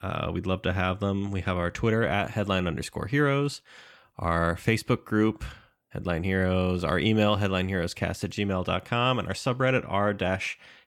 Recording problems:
none

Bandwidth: 17.5 kHz